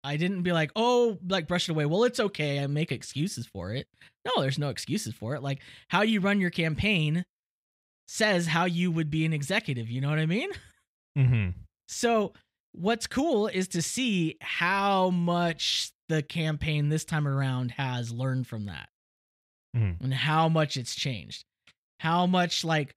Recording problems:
none

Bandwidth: 15.5 kHz